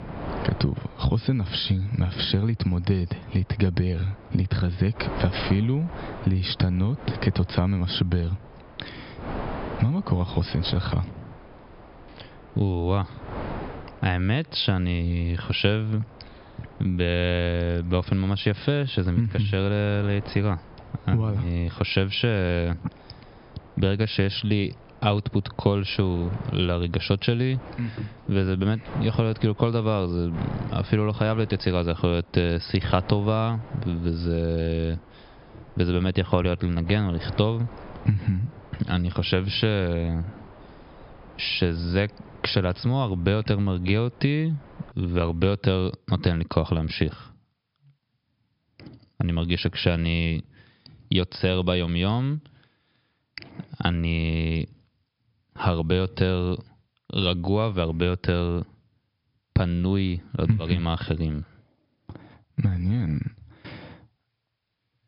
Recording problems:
high frequencies cut off; noticeable; nothing above 5.5 kHz
squashed, flat; somewhat
wind noise on the microphone; occasional gusts; until 45 s; 15 dB below the speech

